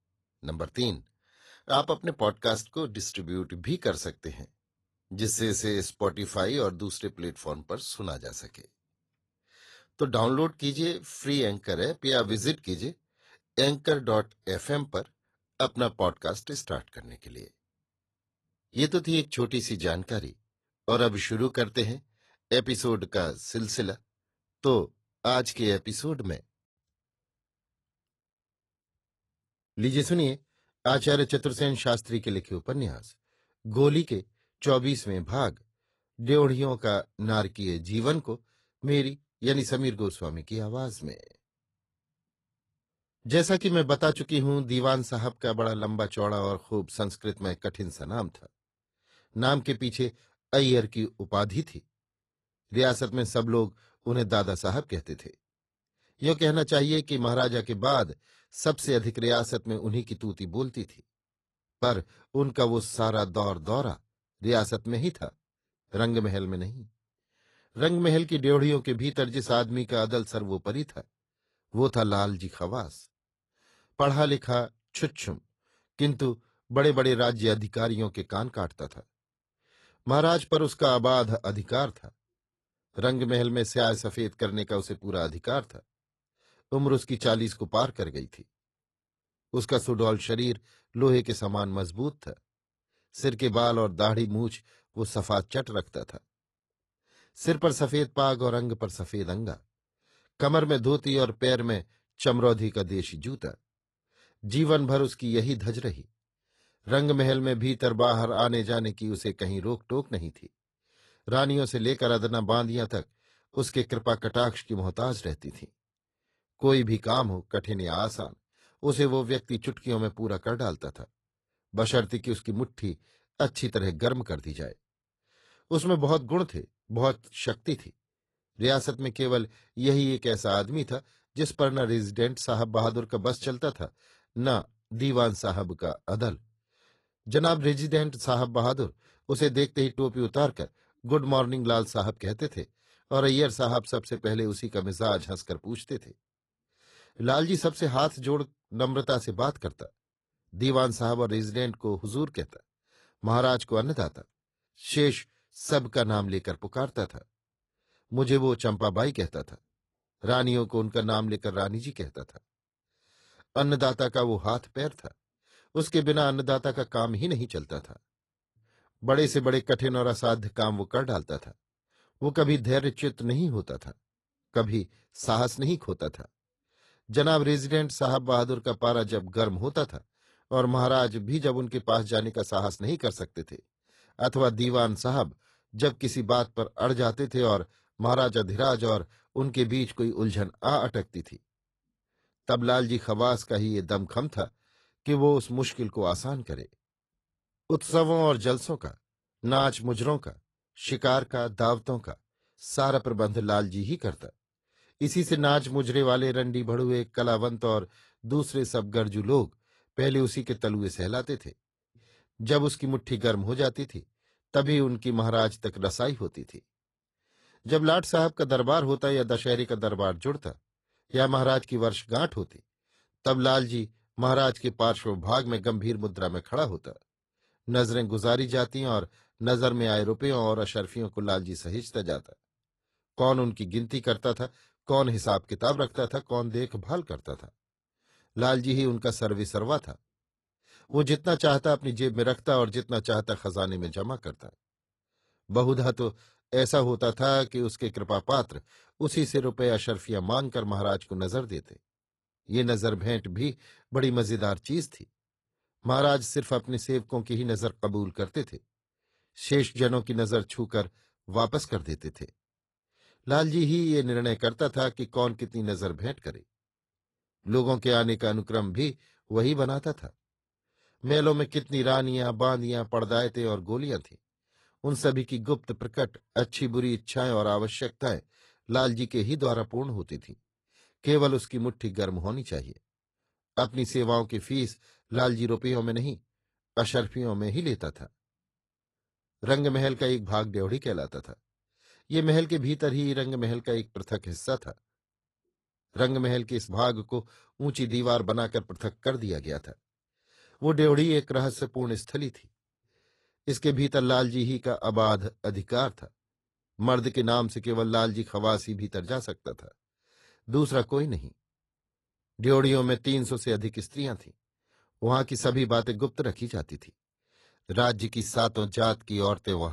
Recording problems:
garbled, watery; slightly; nothing above 11.5 kHz
abrupt cut into speech; at the end

